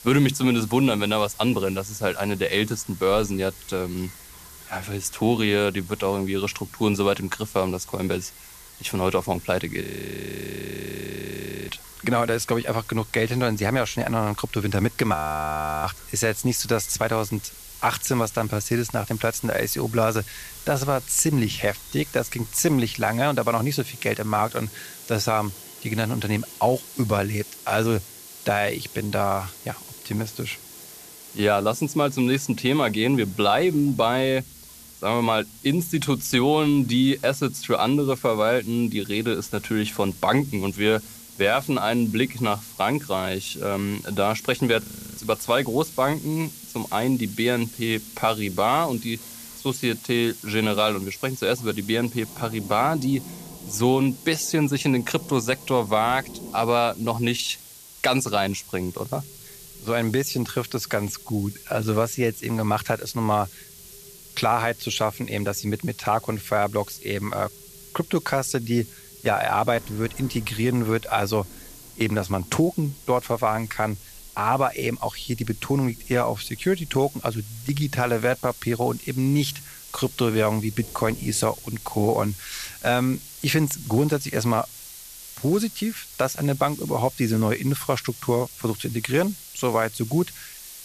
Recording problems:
hiss; noticeable; throughout; 15 dB below the speech
rain or running water; faint; throughout; 25 dB below the speech
audio freezing; at 10 s for 2 s, at 15 s for 0.5 s and at 45 s

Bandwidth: 14.5 kHz